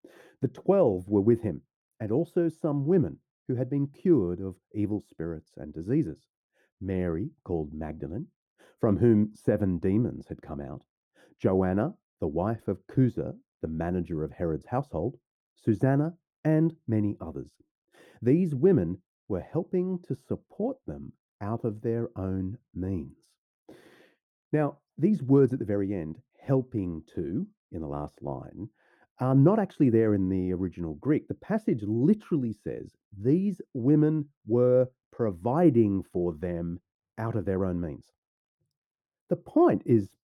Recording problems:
muffled; very; fading above 1 kHz

